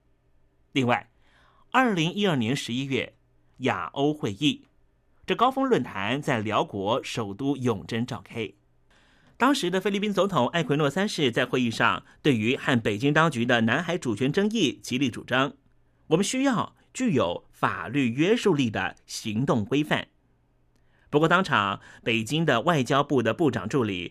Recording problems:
none

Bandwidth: 14.5 kHz